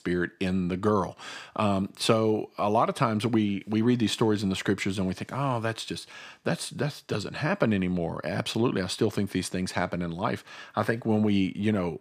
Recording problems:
none

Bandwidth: 15 kHz